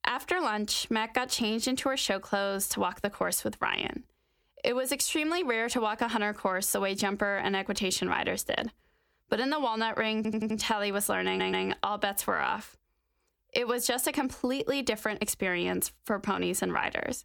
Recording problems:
squashed, flat; somewhat
audio stuttering; at 10 s and at 11 s

